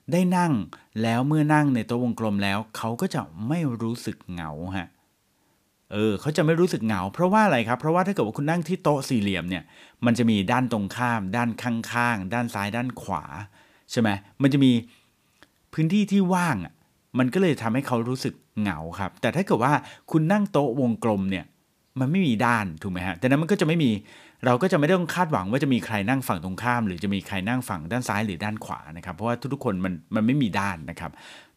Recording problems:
none

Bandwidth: 15 kHz